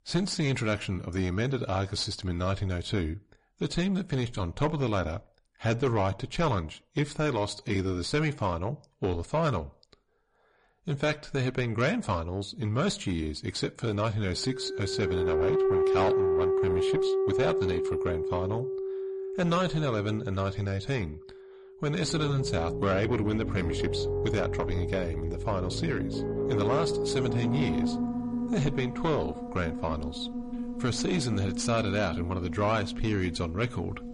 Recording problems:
distortion; slight; 10 dB below the speech
garbled, watery; slightly; nothing above 10.5 kHz
background music; loud; from 15 s on; 1 dB below the speech

